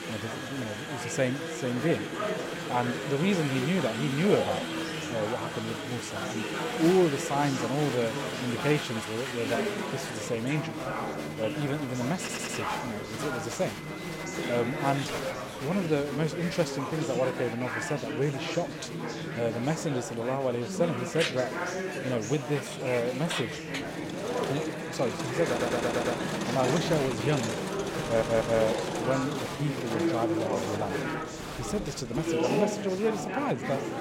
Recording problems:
chatter from many people; loud; throughout; 2 dB below the speech
audio stuttering; at 12 s, at 25 s and at 28 s

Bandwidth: 16.5 kHz